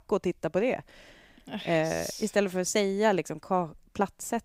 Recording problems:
none

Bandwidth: 15.5 kHz